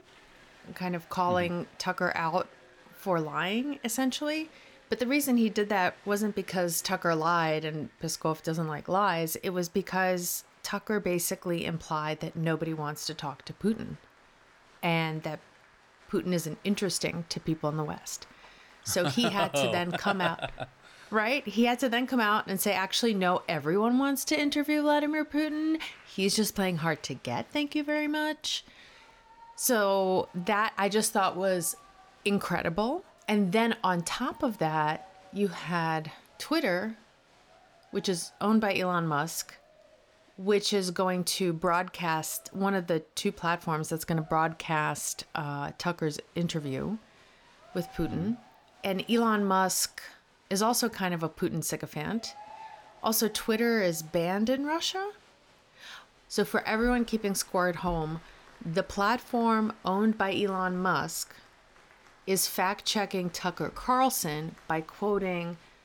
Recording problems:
crowd noise; faint; throughout; 25 dB below the speech

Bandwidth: 18 kHz